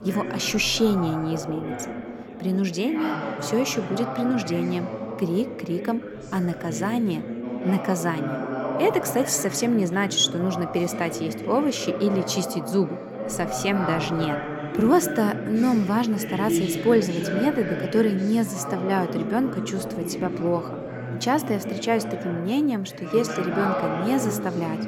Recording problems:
background chatter; loud; throughout; 4 voices, 6 dB below the speech

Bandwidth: 18 kHz